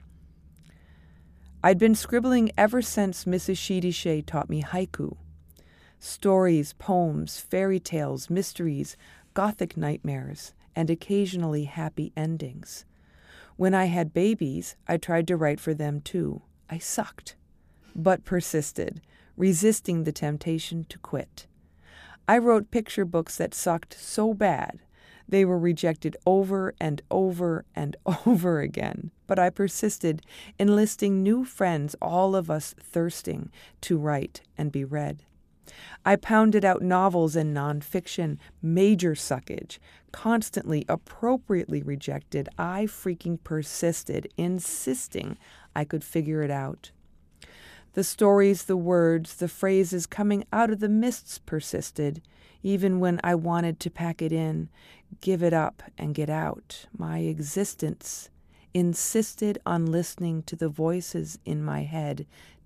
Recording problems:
none

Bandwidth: 14.5 kHz